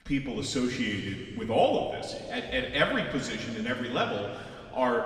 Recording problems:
off-mic speech; far
room echo; noticeable; dies away in 2.2 s

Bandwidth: 15 kHz